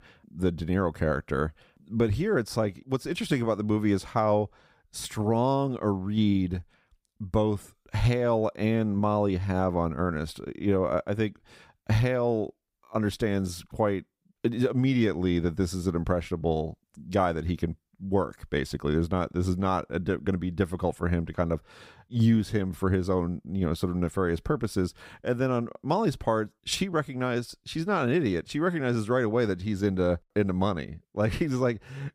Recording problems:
none

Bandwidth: 15.5 kHz